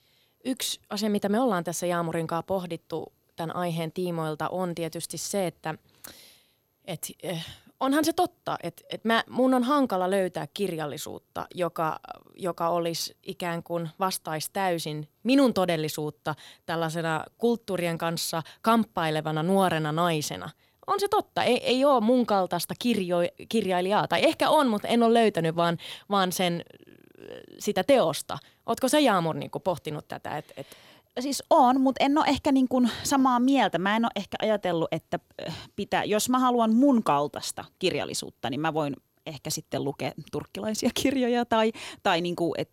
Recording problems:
none

